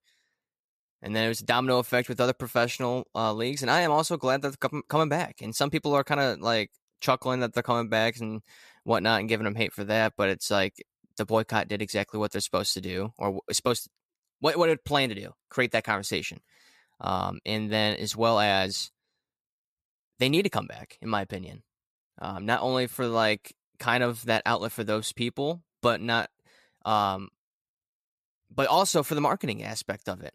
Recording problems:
none

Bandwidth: 14.5 kHz